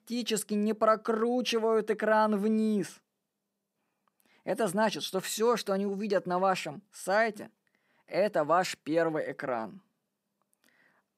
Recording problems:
none

